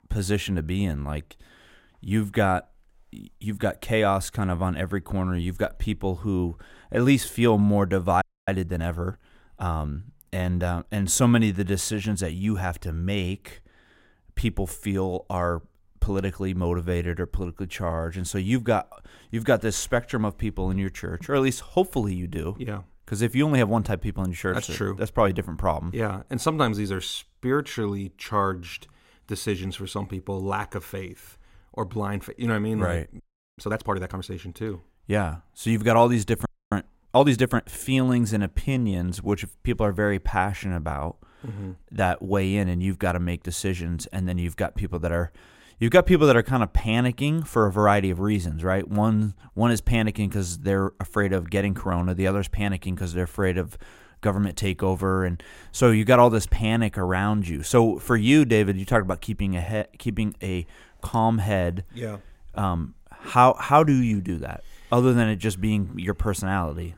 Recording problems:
audio freezing; at 8 s, at 33 s and at 36 s

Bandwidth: 16 kHz